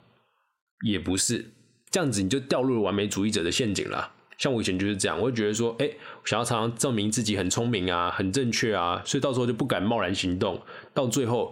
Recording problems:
squashed, flat; heavily

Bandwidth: 16.5 kHz